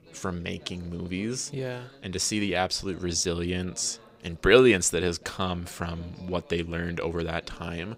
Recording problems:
background chatter; faint; throughout; 3 voices, 25 dB below the speech

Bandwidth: 15.5 kHz